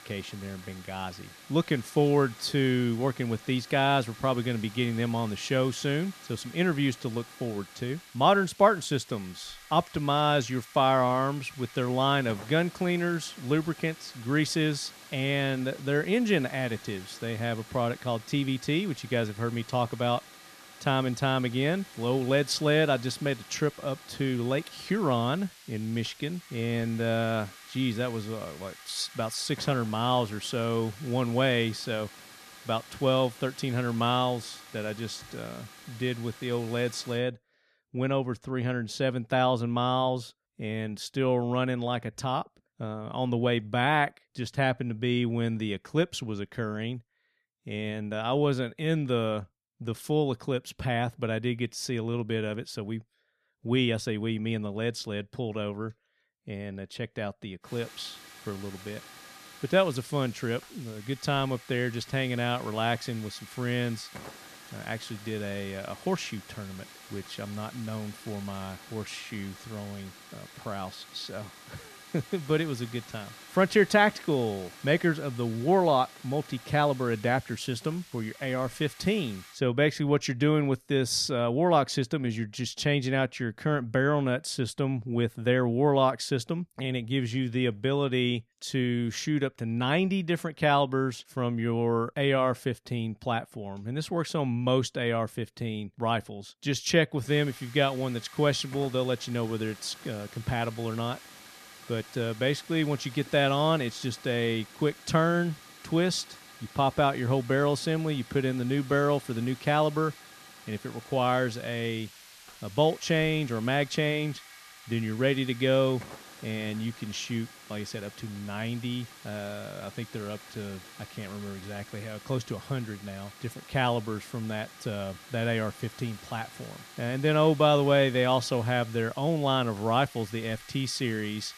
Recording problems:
hiss; noticeable; until 37 s, from 58 s to 1:20 and from 1:37 on; 20 dB below the speech

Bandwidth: 14 kHz